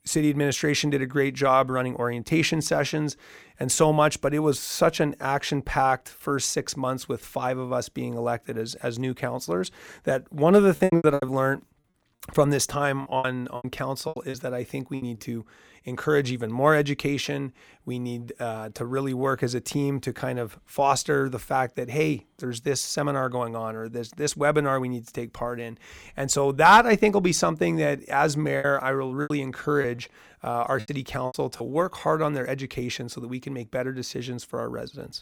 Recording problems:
choppy; very; from 11 to 15 s and from 29 to 32 s; 15% of the speech affected

